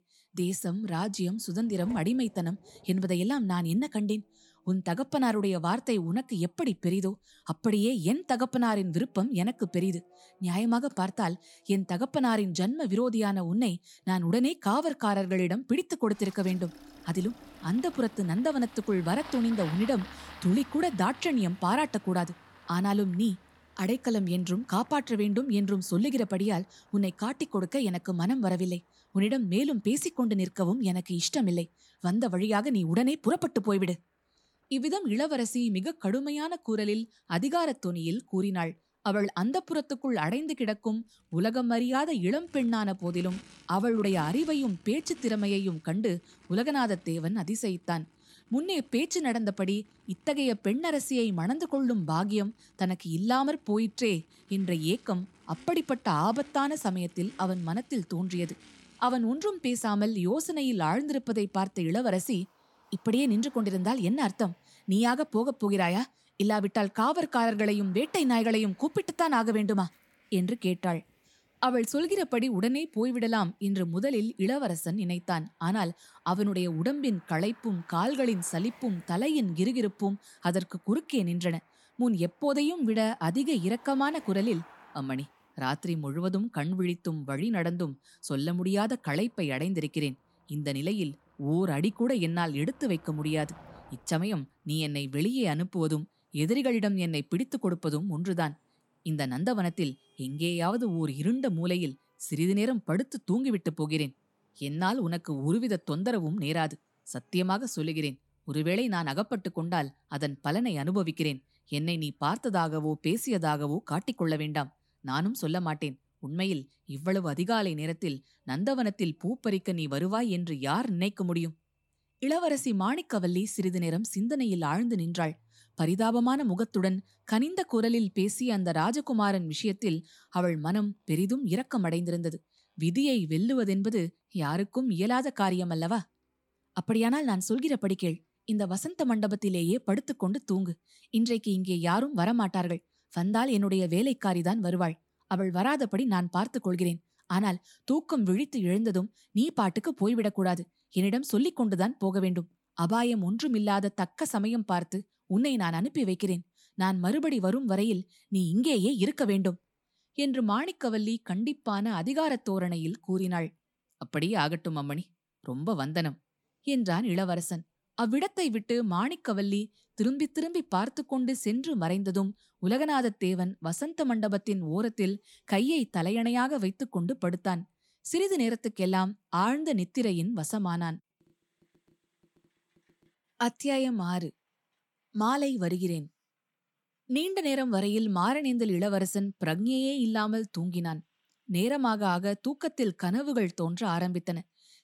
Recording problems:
traffic noise; faint; throughout; 25 dB below the speech

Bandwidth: 17 kHz